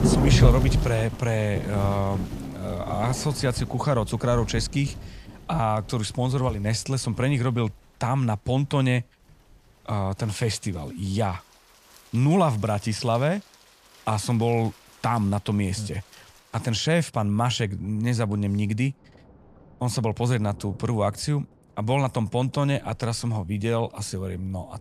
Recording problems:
rain or running water; loud; throughout; 3 dB below the speech

